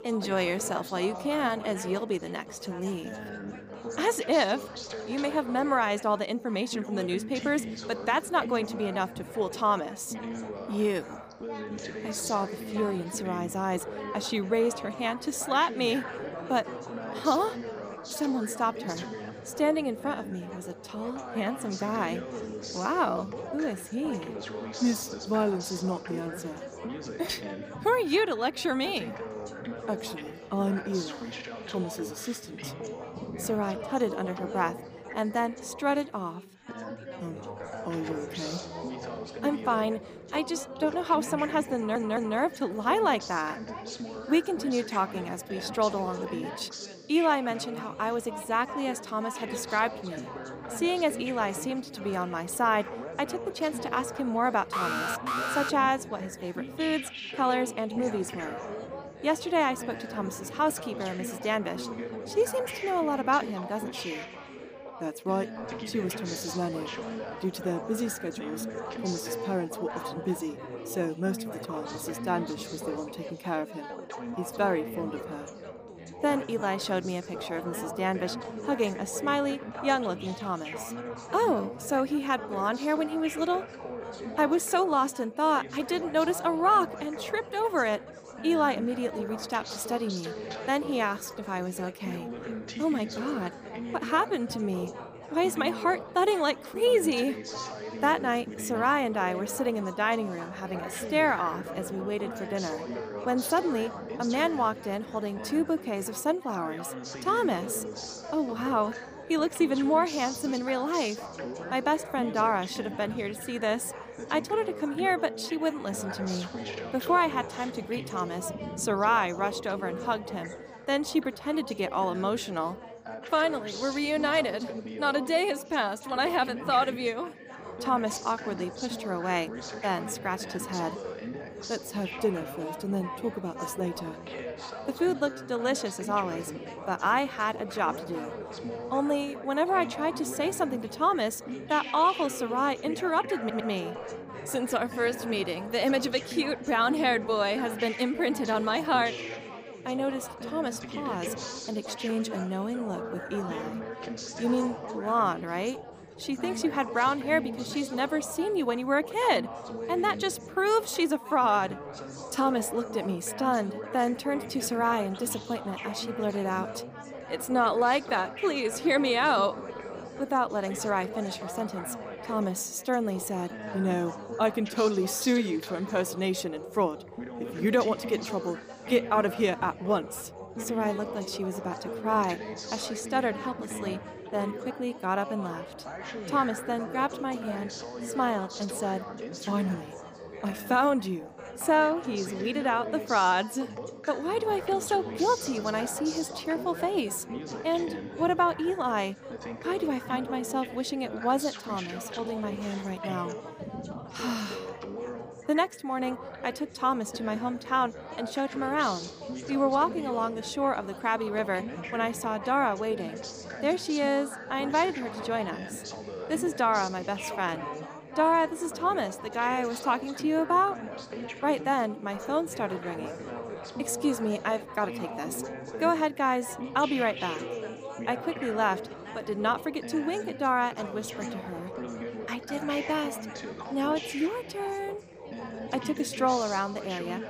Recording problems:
background chatter; loud; throughout; 4 voices, 9 dB below the speech
audio stuttering; at 42 s and at 2:23
alarm; loud; at 55 s; peak level with the speech

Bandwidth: 15 kHz